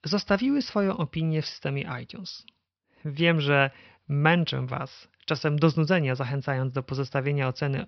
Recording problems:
high frequencies cut off; noticeable; nothing above 5.5 kHz

